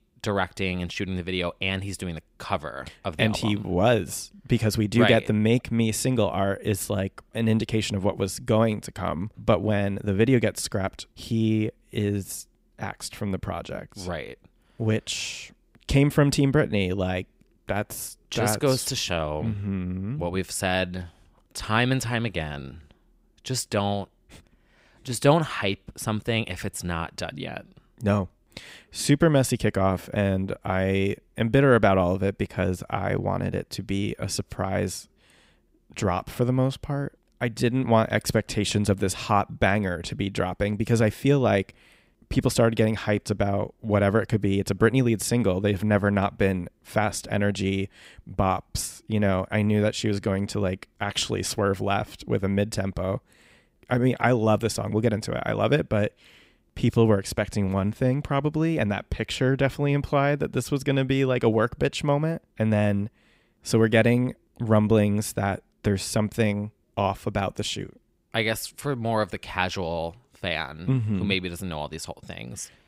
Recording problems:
none

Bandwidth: 15.5 kHz